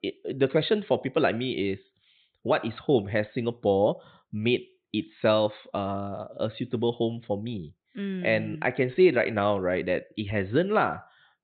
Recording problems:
high frequencies cut off; severe; nothing above 4 kHz

